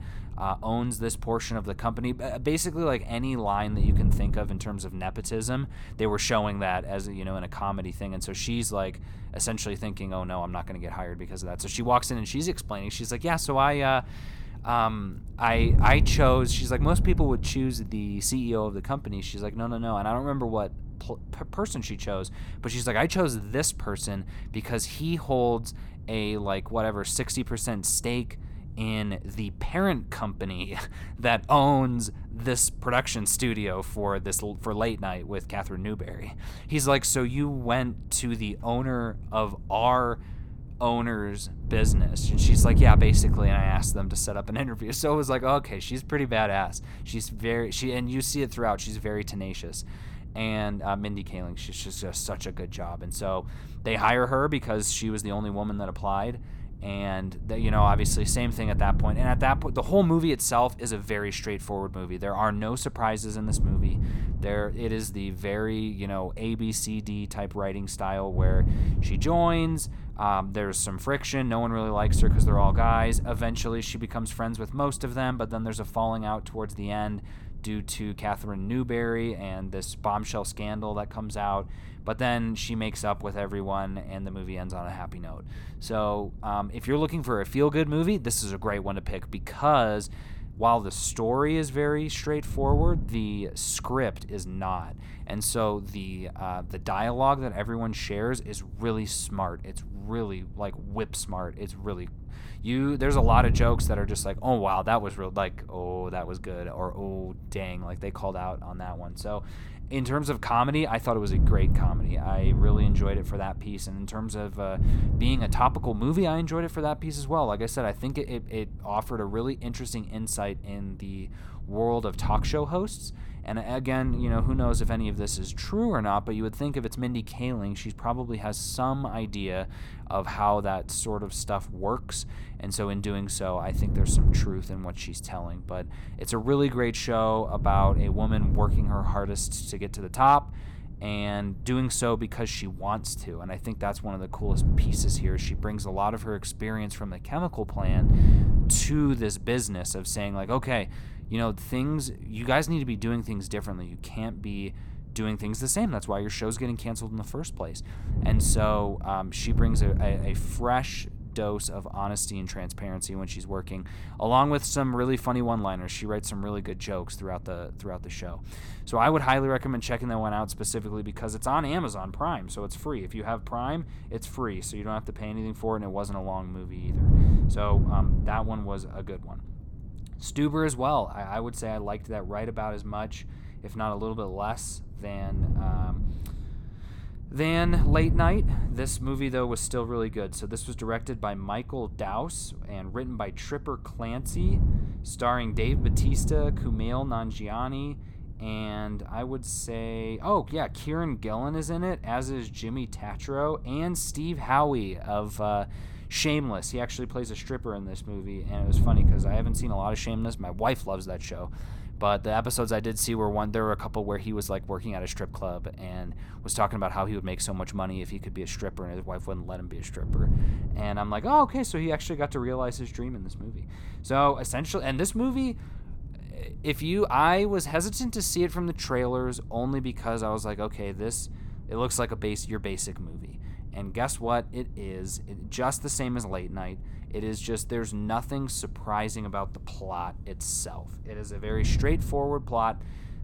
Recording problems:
wind noise on the microphone; occasional gusts; 20 dB below the speech

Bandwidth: 17 kHz